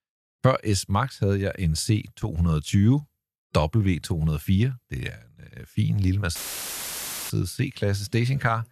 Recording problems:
audio cutting out; filled with static; at 6.5 s for 1 s

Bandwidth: 13.5 kHz